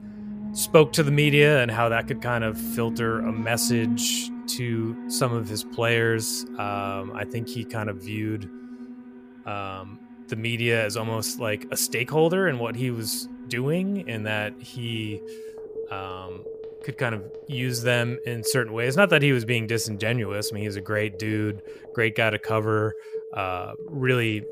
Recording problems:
alarms or sirens; noticeable; throughout; 10 dB below the speech

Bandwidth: 15 kHz